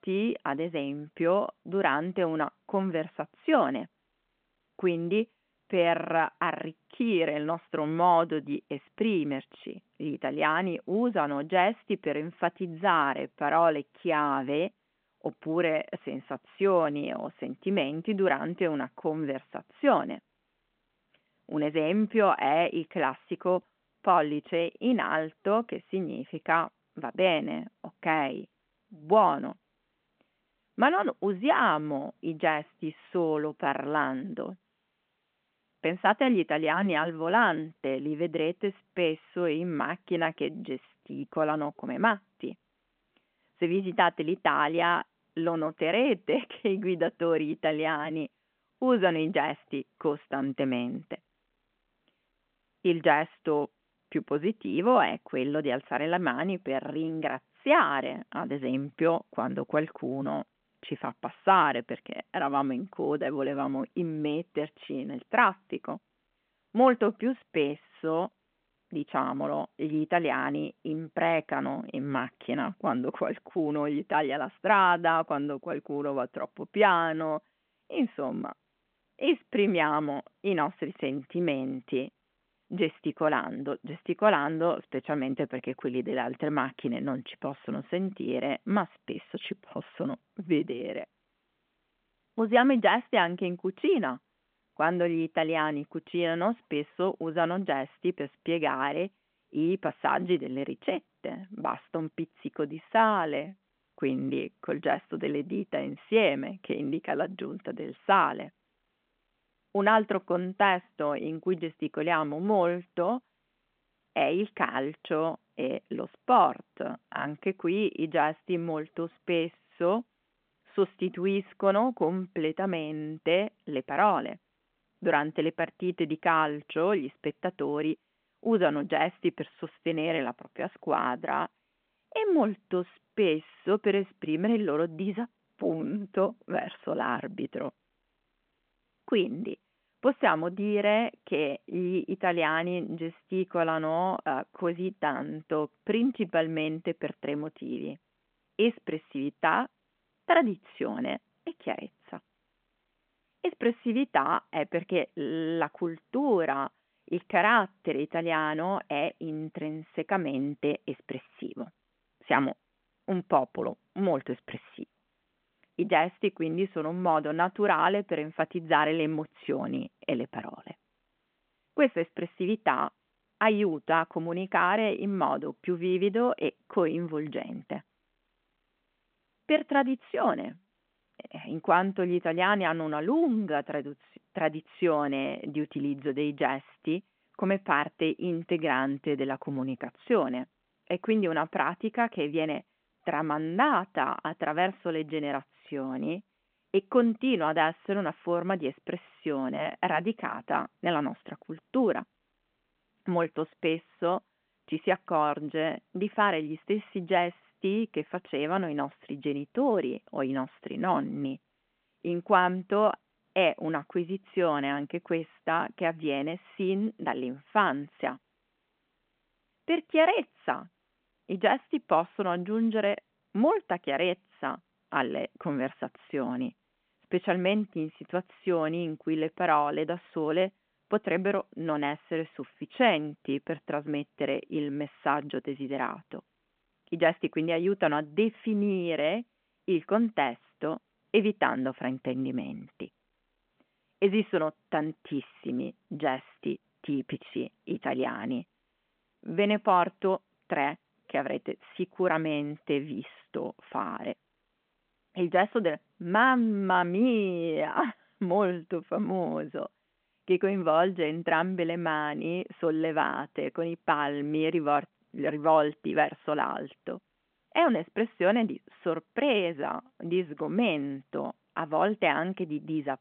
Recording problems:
phone-call audio

